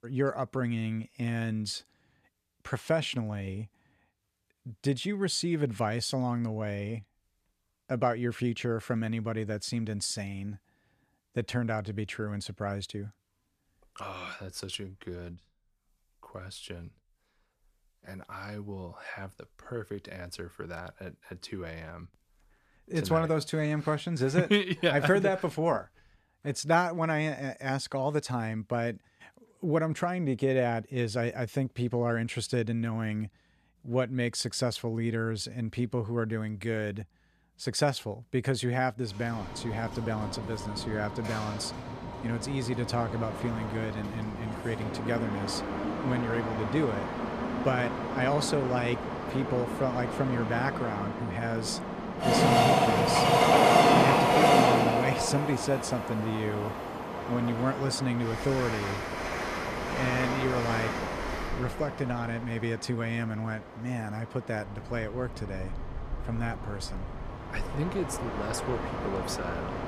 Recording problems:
train or aircraft noise; very loud; from 39 s on; 2 dB above the speech

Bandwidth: 14.5 kHz